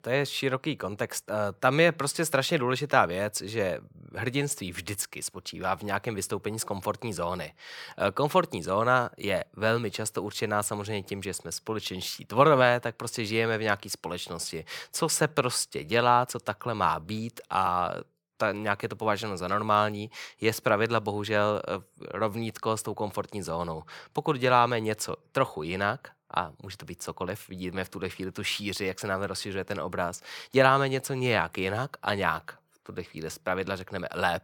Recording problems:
none

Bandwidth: 18 kHz